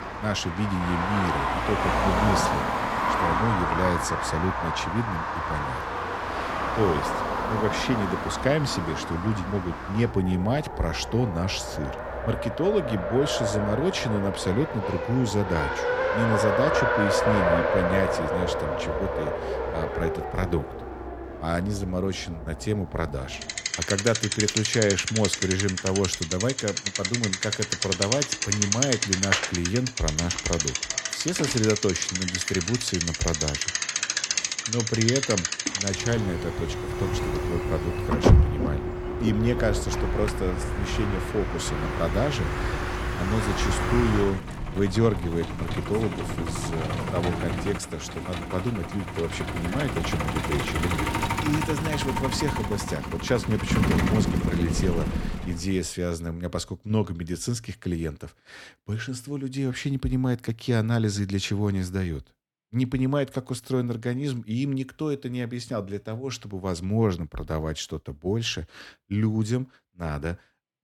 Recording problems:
traffic noise; very loud; until 55 s; 1 dB above the speech

